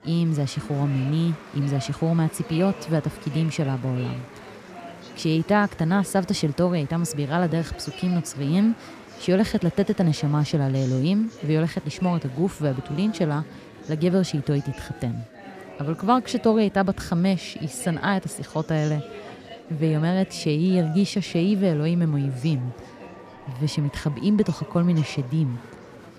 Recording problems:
murmuring crowd; noticeable; throughout; 15 dB below the speech

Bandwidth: 14.5 kHz